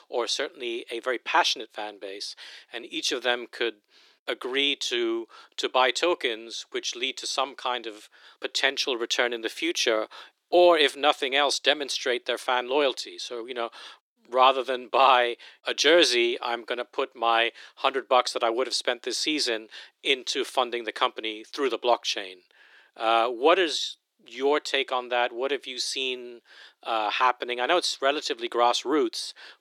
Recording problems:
thin; very; fading below 300 Hz

